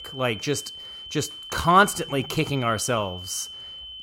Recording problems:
high-pitched whine; noticeable; throughout; 3 kHz, 10 dB below the speech

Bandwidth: 16 kHz